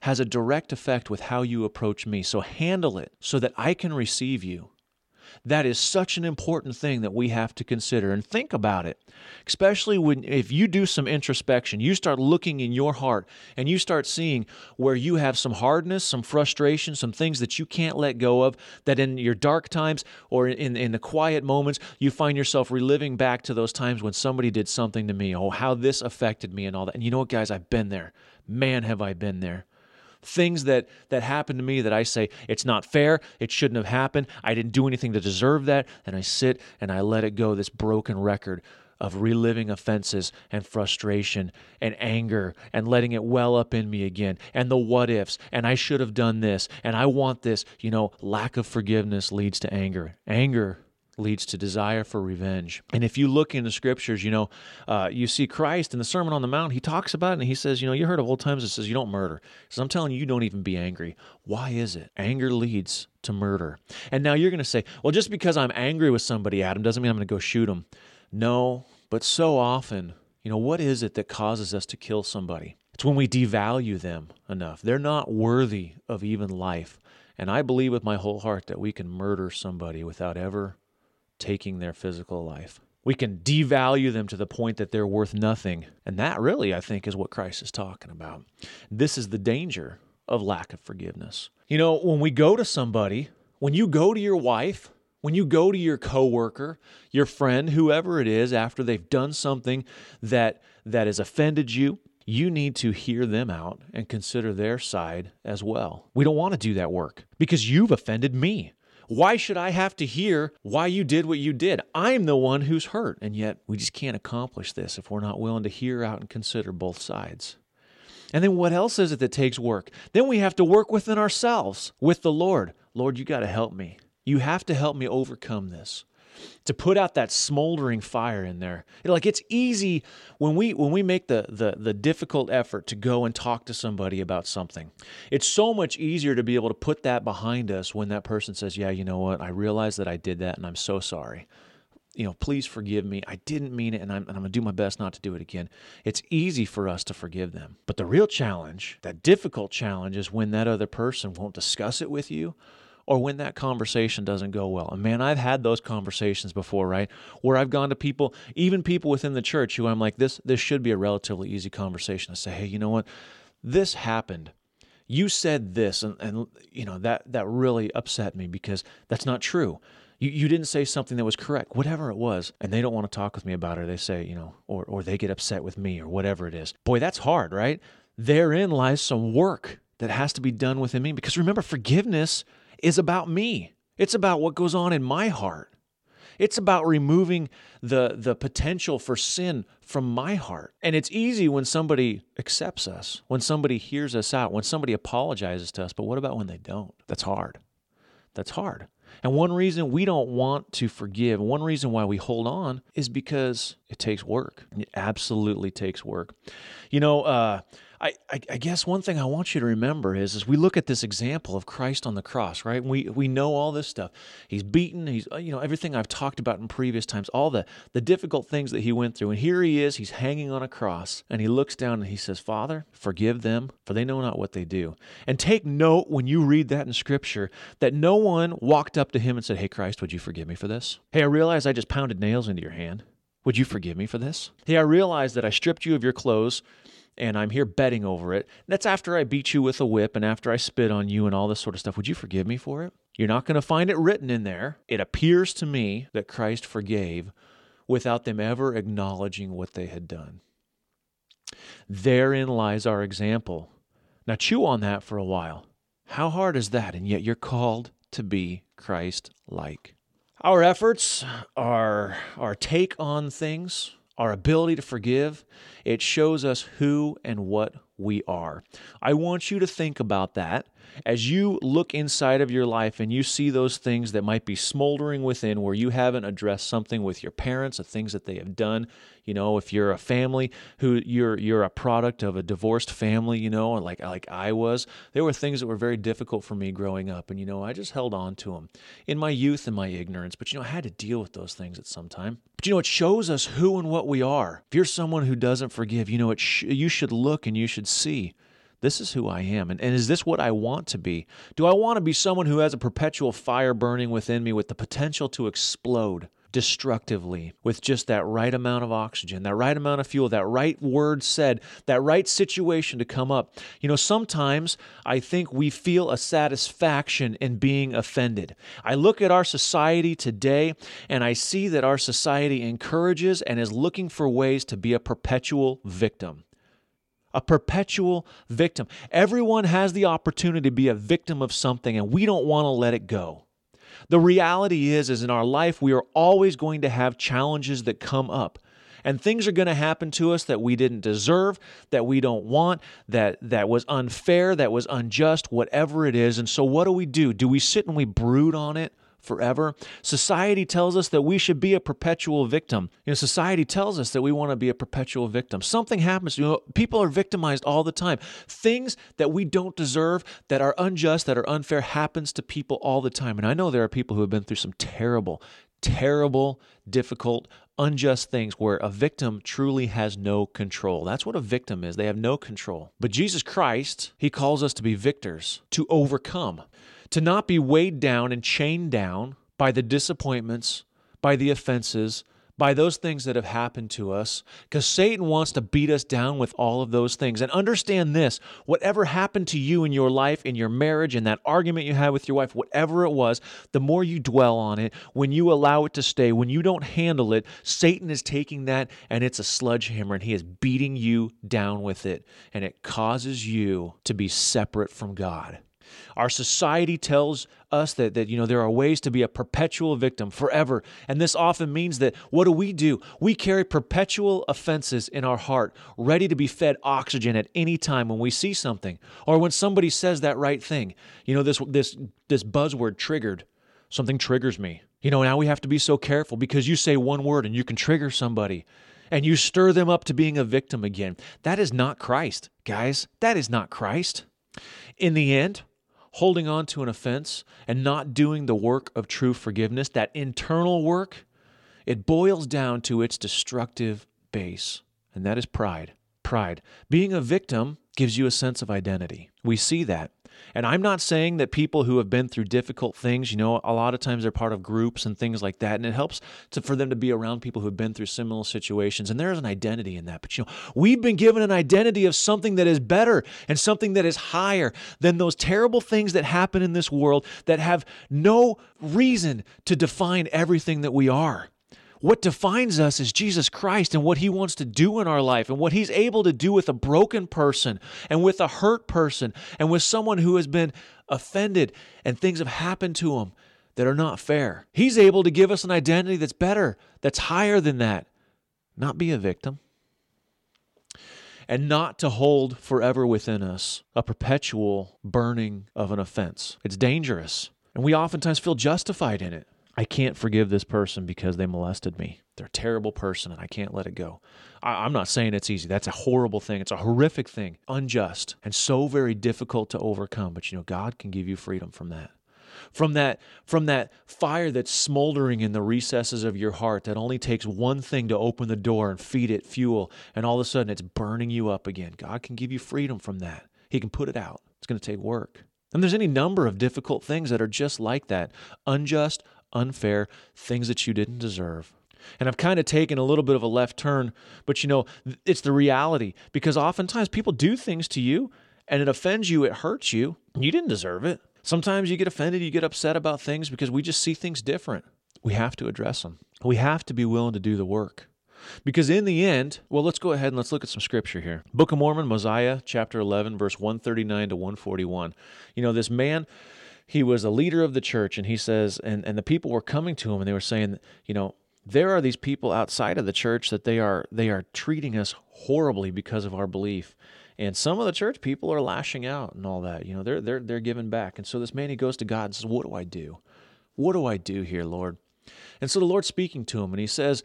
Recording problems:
none

